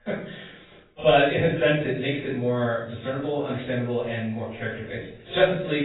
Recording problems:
off-mic speech; far
garbled, watery; badly; nothing above 4 kHz
room echo; noticeable; dies away in 0.5 s
abrupt cut into speech; at the end

